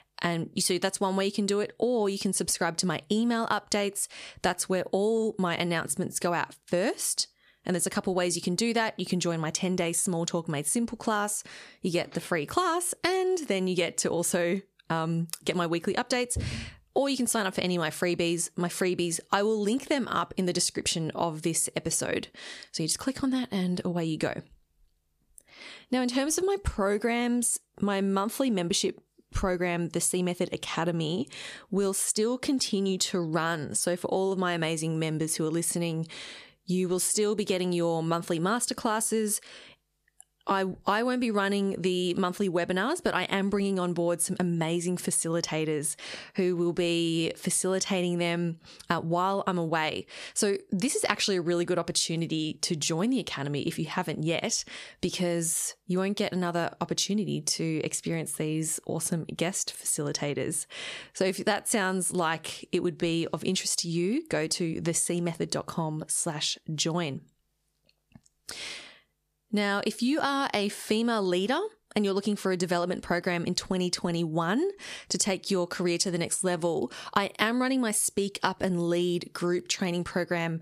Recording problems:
squashed, flat; somewhat

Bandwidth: 14.5 kHz